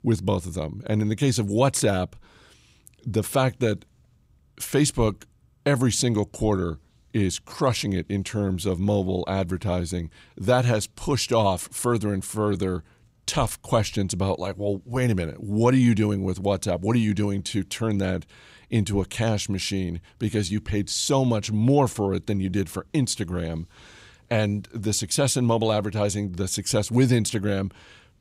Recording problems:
none

